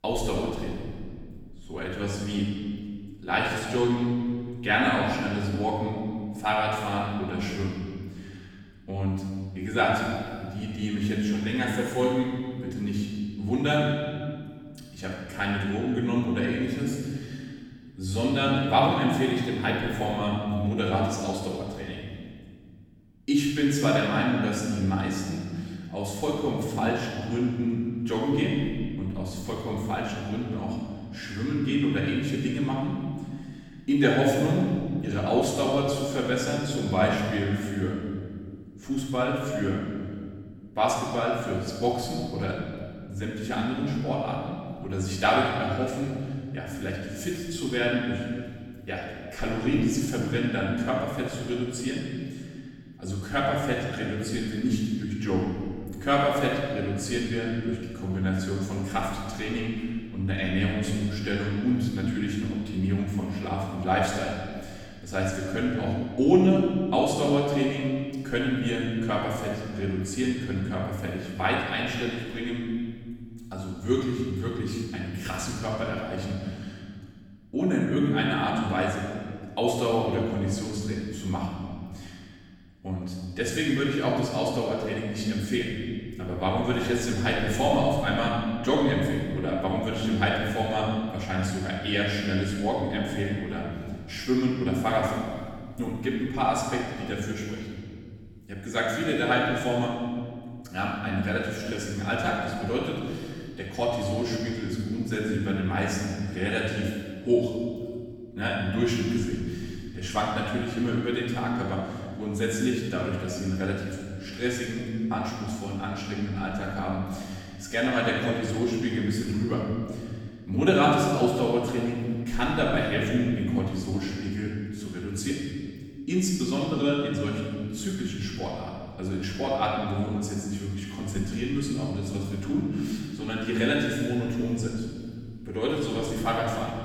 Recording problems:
room echo; strong; dies away in 1.9 s
off-mic speech; far

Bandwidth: 18.5 kHz